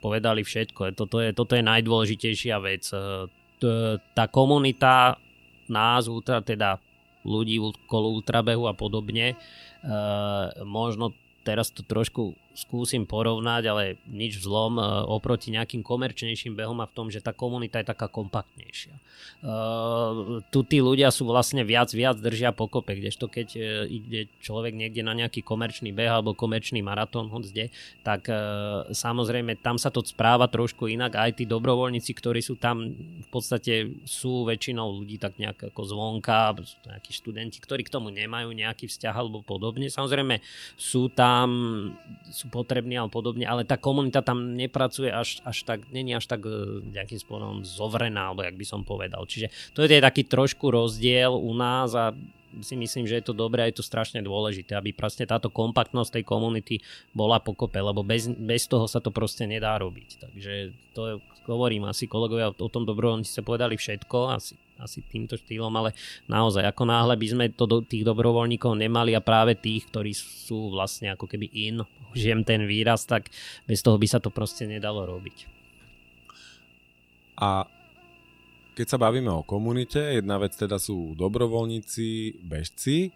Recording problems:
electrical hum; faint; throughout; 60 Hz, 30 dB below the speech

